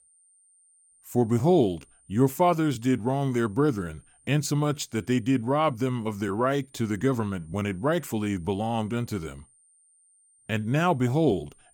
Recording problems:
high-pitched whine; faint; throughout; 9 kHz, 30 dB below the speech

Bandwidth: 17 kHz